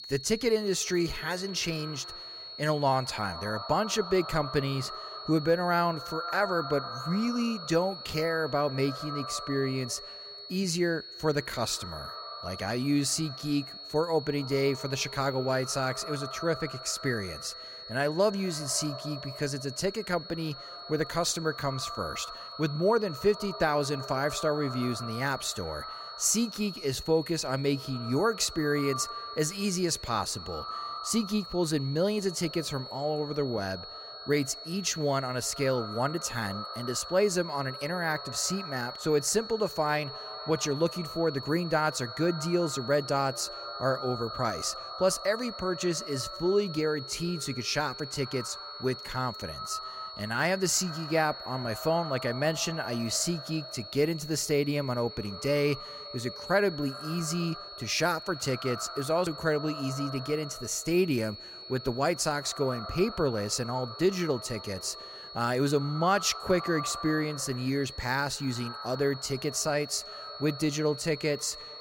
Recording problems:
echo of what is said; noticeable; throughout; 120 ms later, 15 dB below the speech
high-pitched whine; noticeable; throughout; 4.5 kHz, 10 dB below the speech

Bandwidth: 16 kHz